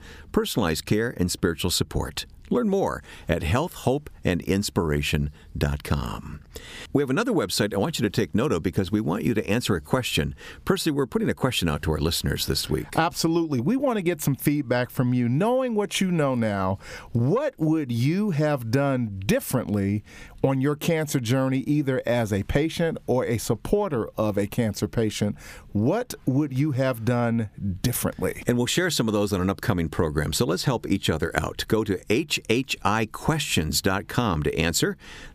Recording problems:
squashed, flat; somewhat

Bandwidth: 15 kHz